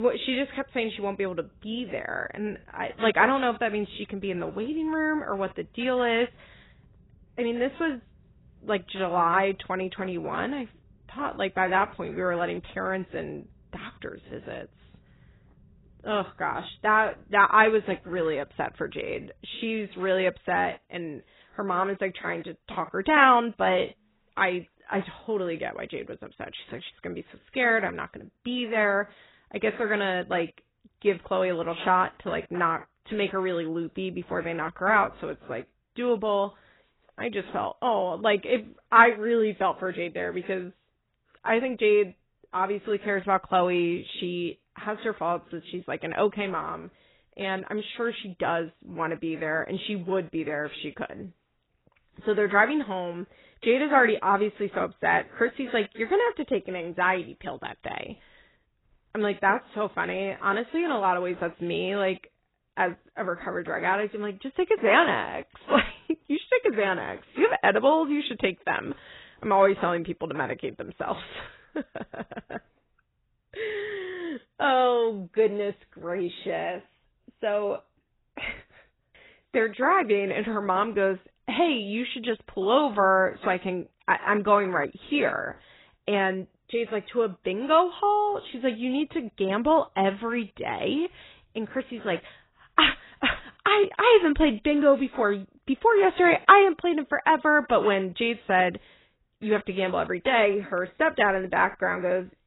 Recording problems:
garbled, watery; badly; nothing above 4 kHz
abrupt cut into speech; at the start

